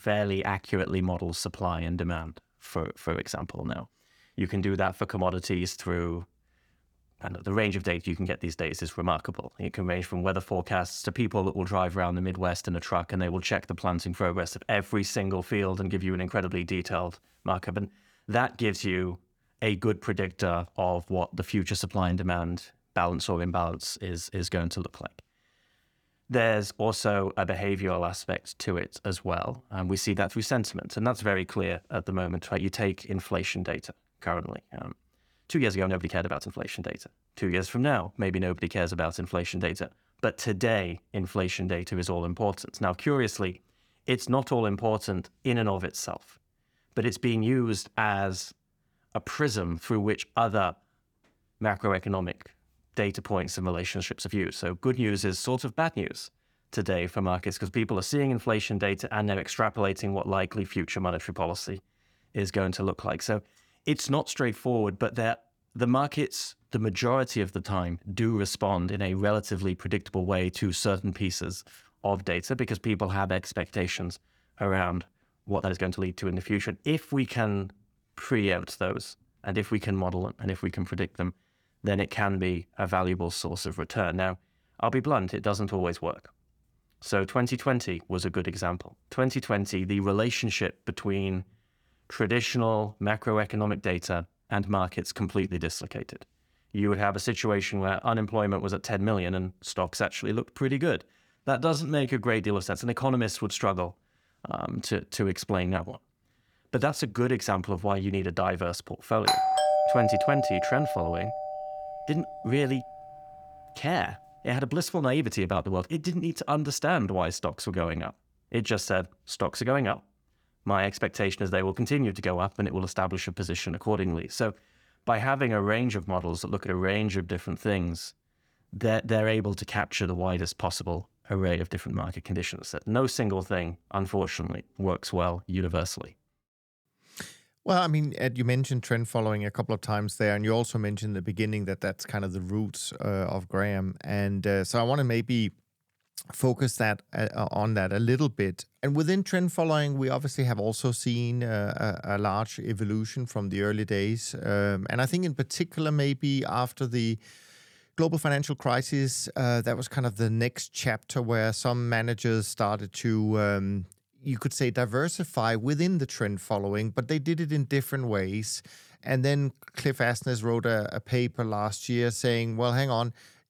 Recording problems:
uneven, jittery; strongly; from 3 s to 2:52
doorbell; loud; from 1:49 to 1:52; peak 5 dB above the speech

